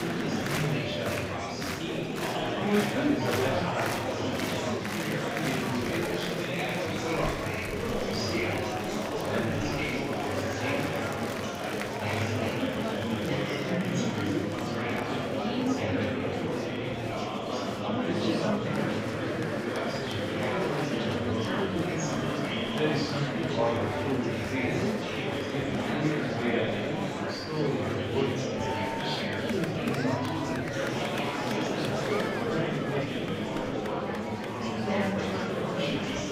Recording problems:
off-mic speech; far
room echo; noticeable; dies away in 0.7 s
murmuring crowd; very loud; throughout; 5 dB above the speech
background music; very faint; throughout; 25 dB below the speech

